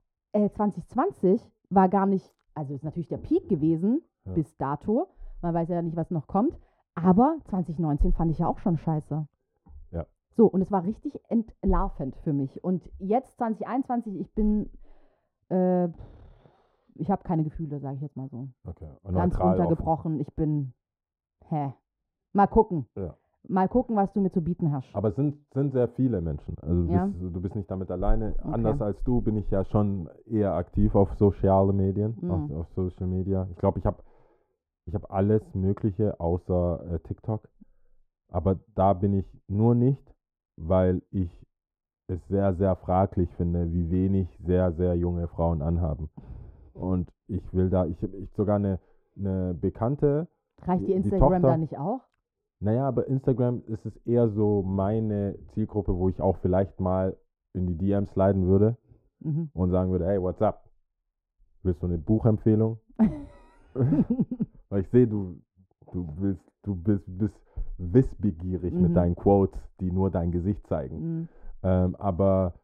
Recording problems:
muffled; very; fading above 1.5 kHz

